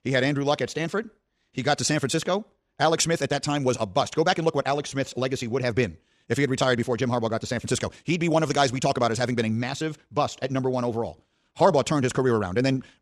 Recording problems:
wrong speed, natural pitch; too fast; 1.6 times normal speed

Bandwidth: 15 kHz